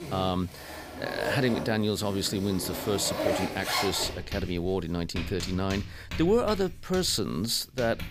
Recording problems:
household noises; loud; throughout; 6 dB below the speech

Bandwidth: 15 kHz